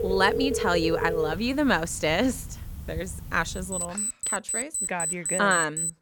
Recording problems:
alarms or sirens; loud; throughout; 2 dB below the speech

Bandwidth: 17.5 kHz